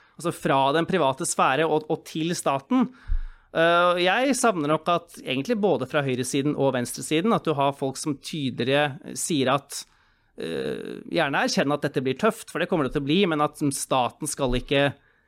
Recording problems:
none

